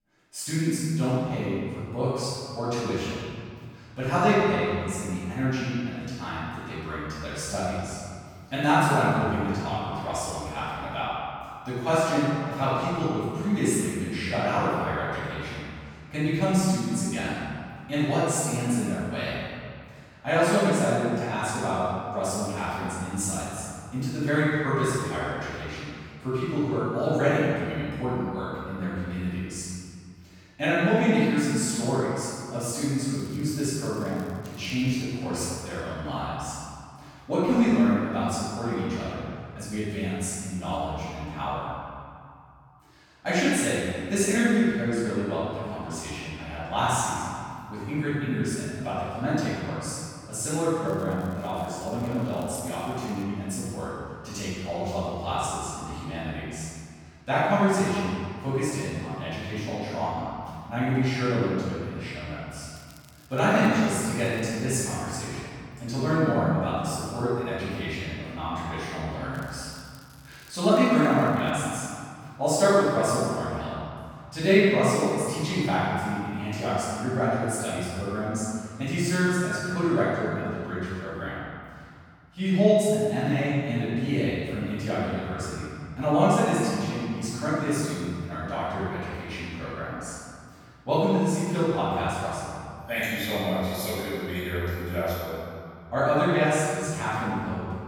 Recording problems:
room echo; strong; dies away in 2.1 s
off-mic speech; far
crackling; faint; 4 times, first at 33 s; 25 dB below the speech

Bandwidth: 18 kHz